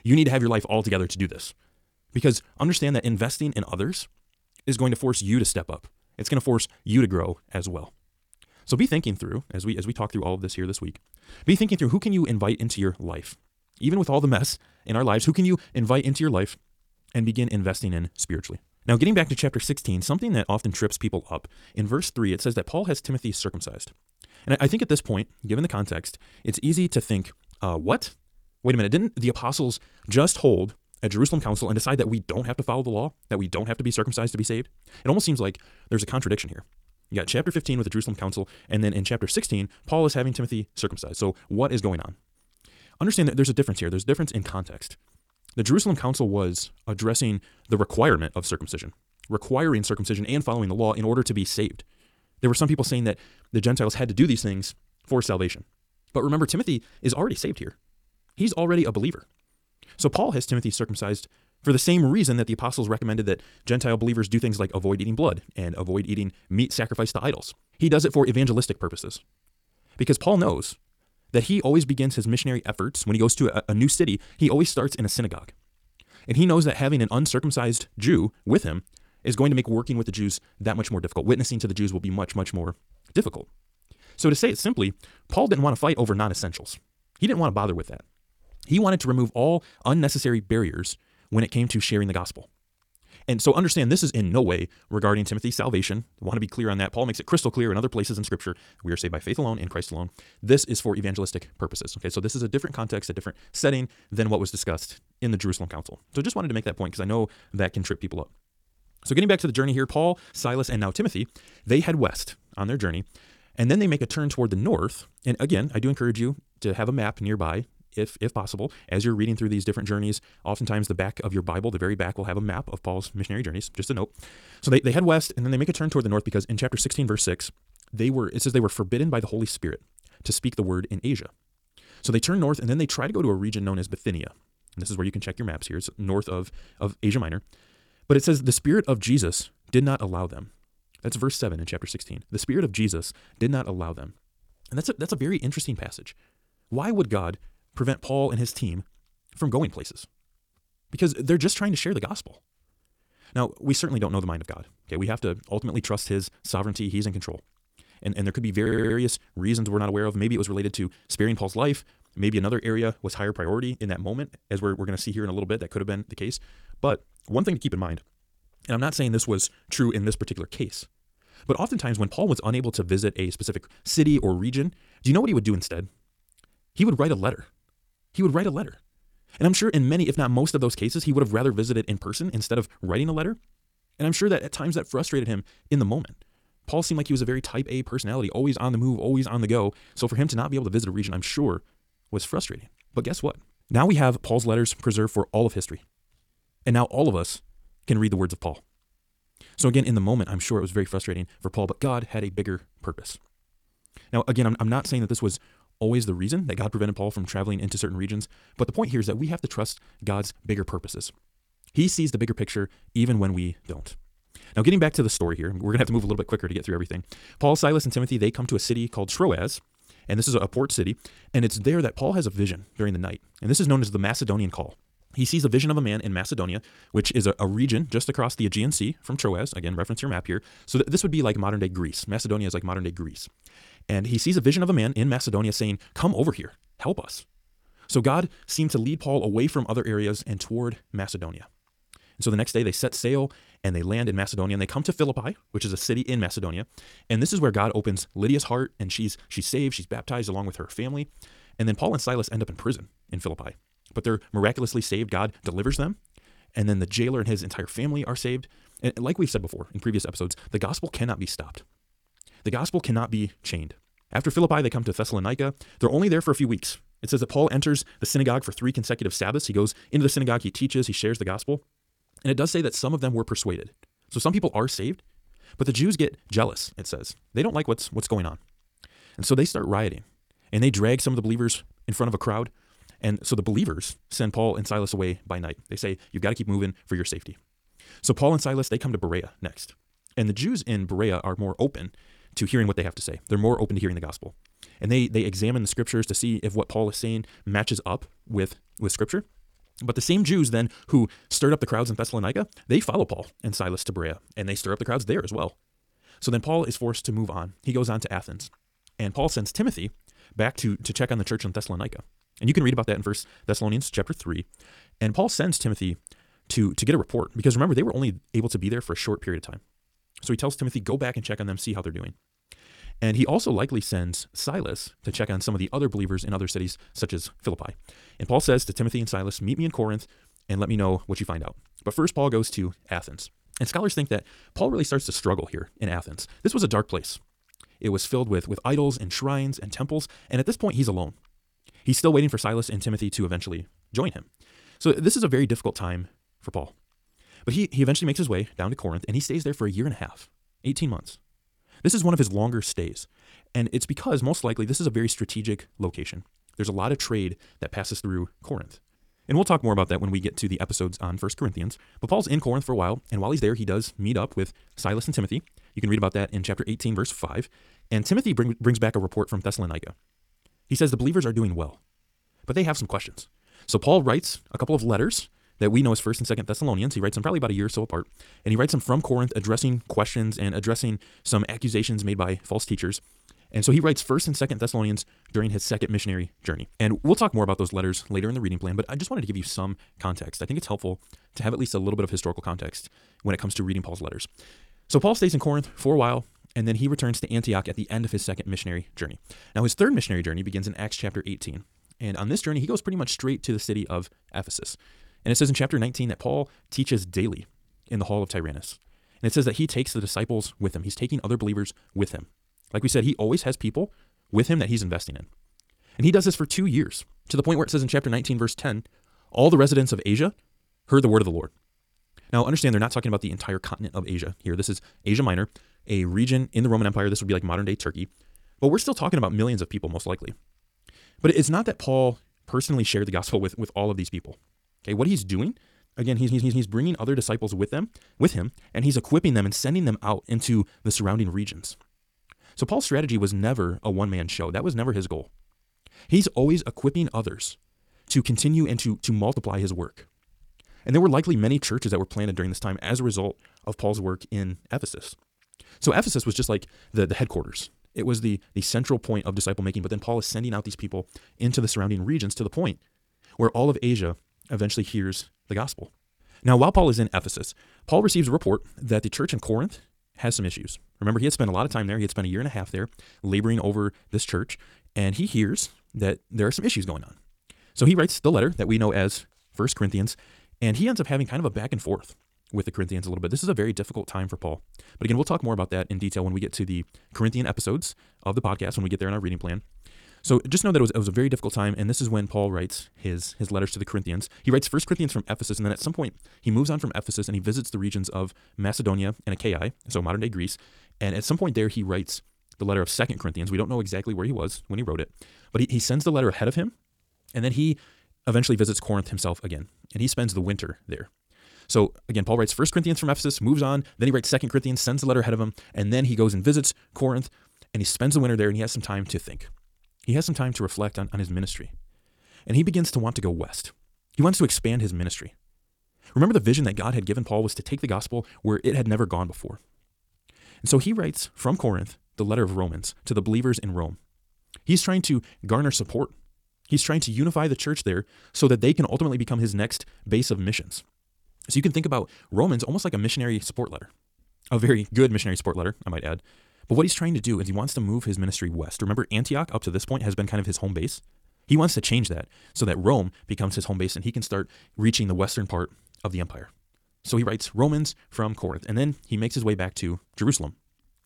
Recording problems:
wrong speed, natural pitch; too fast; 1.5 times normal speed
audio stuttering; at 2:39 and at 7:16

